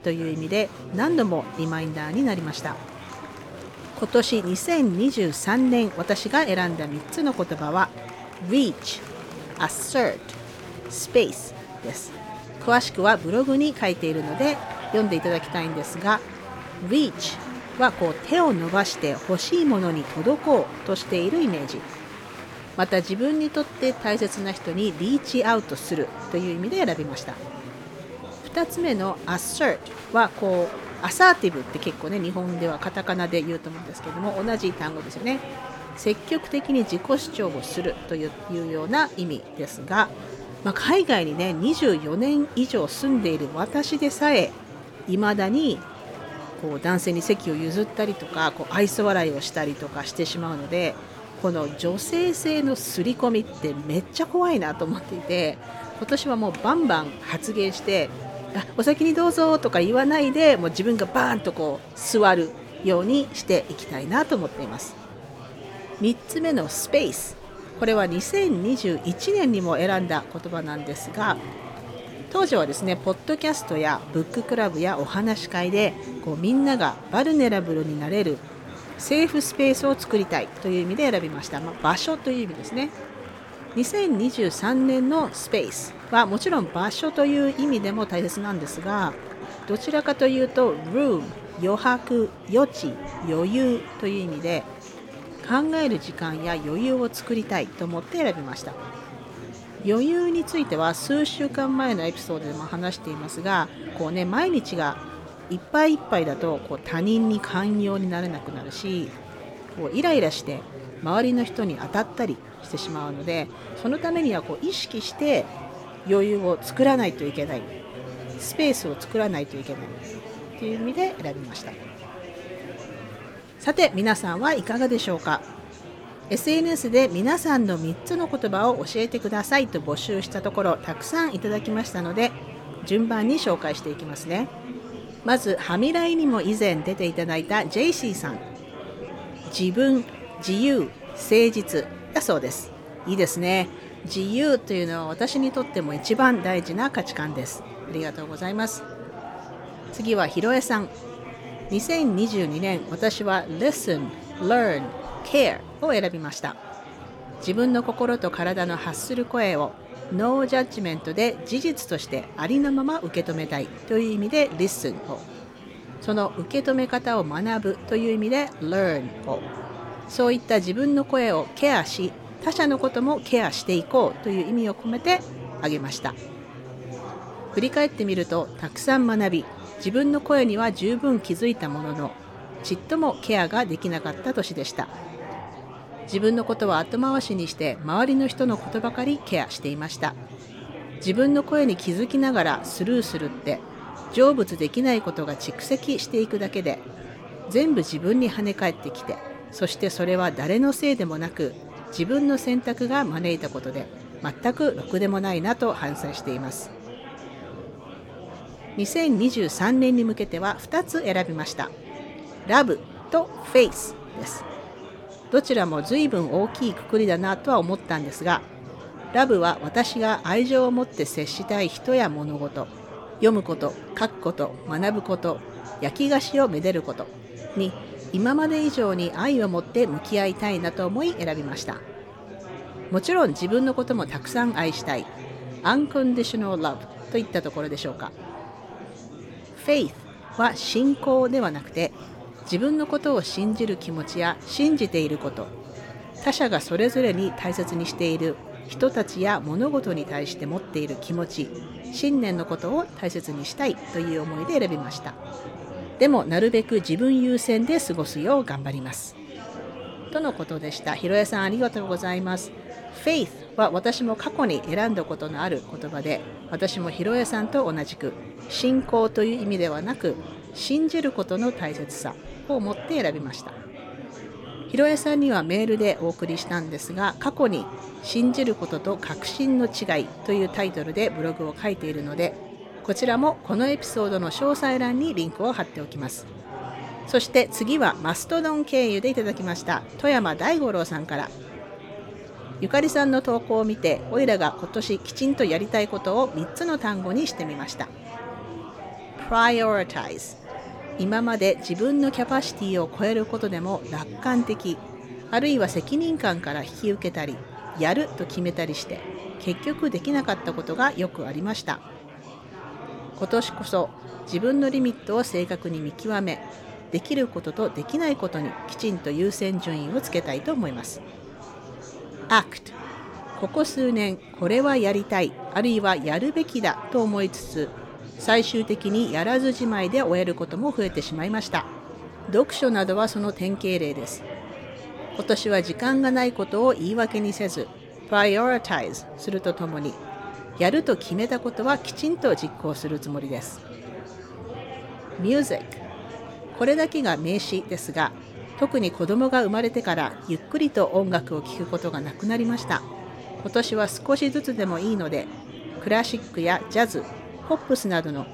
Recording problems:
murmuring crowd; noticeable; throughout; 15 dB below the speech

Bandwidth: 17.5 kHz